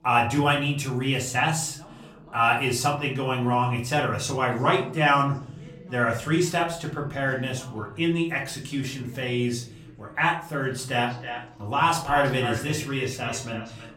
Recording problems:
echo of what is said; strong; from 11 s on; 330 ms later, 10 dB below the speech
off-mic speech; far
room echo; slight; dies away in 0.5 s
voice in the background; faint; throughout; 25 dB below the speech

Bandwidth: 16 kHz